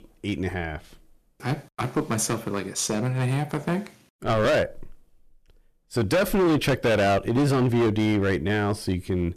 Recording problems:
distortion; heavy; 11% of the sound clipped

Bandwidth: 14.5 kHz